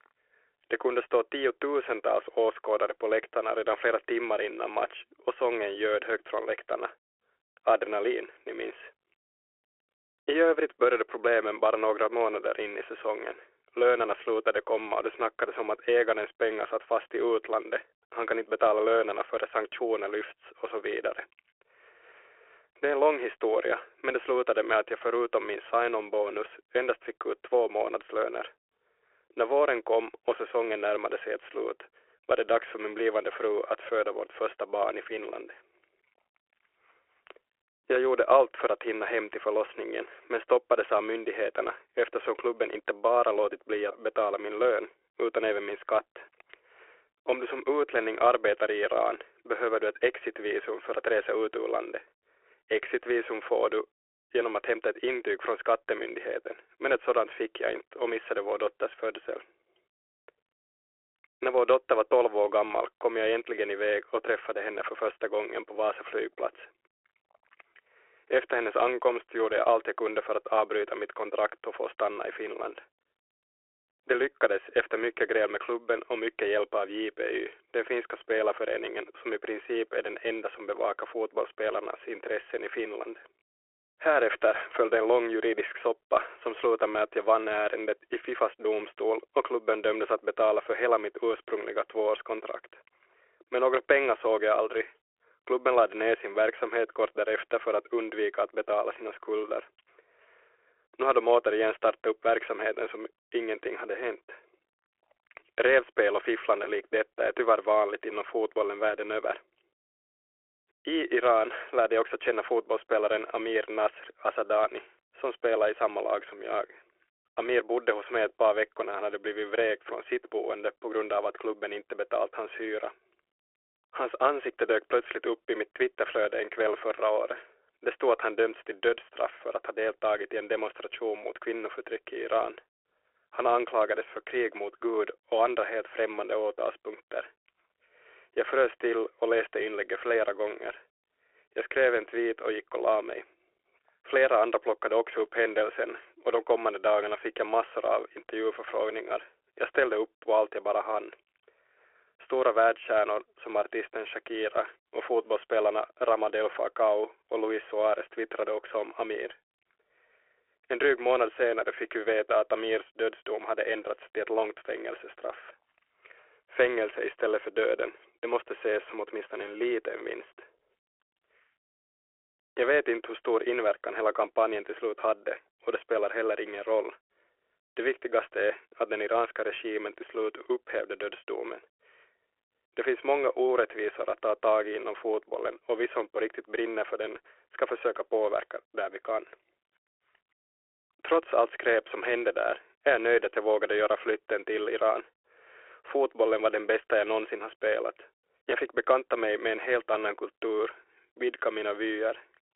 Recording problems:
phone-call audio; nothing above 3.5 kHz

